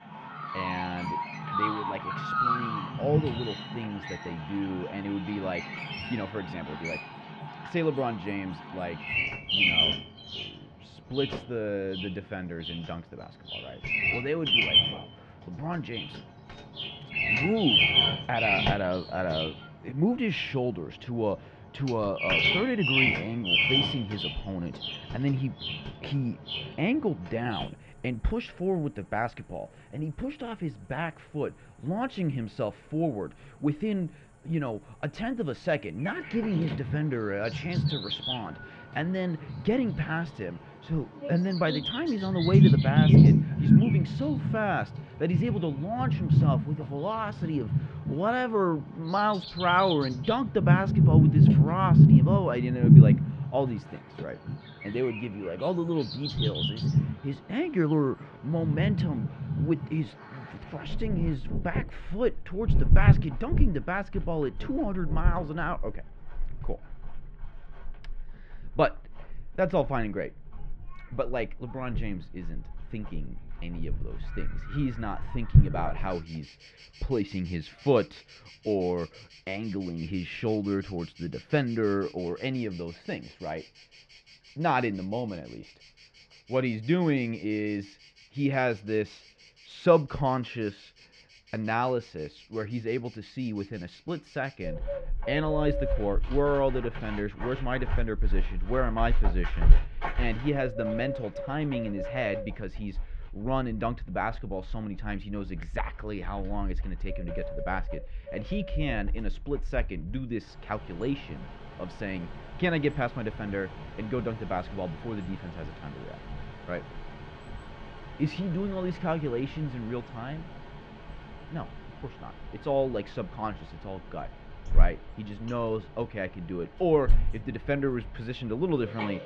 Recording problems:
muffled; very; fading above 2.5 kHz
animal sounds; very loud; throughout; 5 dB above the speech

